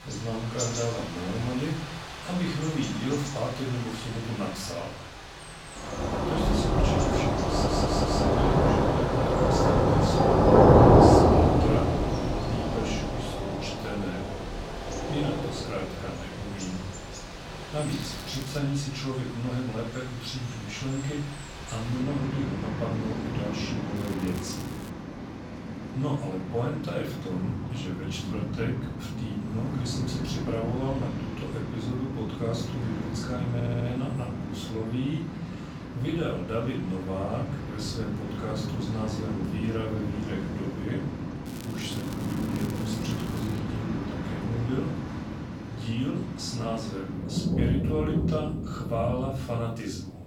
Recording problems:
off-mic speech; far
room echo; noticeable; dies away in 0.5 s
rain or running water; very loud; throughout; 4 dB above the speech
crackling; noticeable; at 18 s, at 24 s and from 41 to 44 s; 15 dB below the speech
audio stuttering; at 7.5 s and at 34 s

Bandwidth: 17 kHz